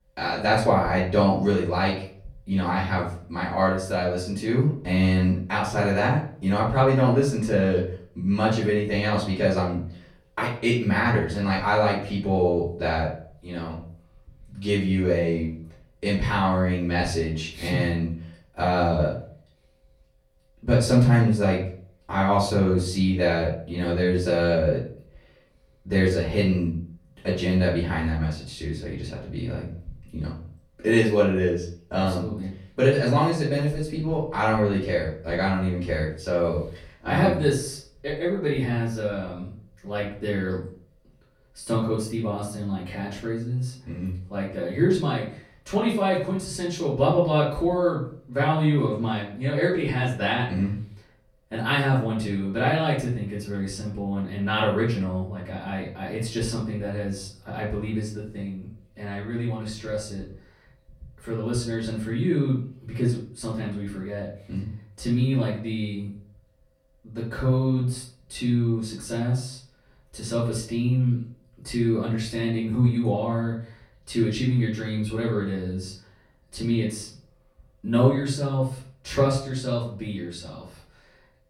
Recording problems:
off-mic speech; far
room echo; noticeable; dies away in 0.4 s

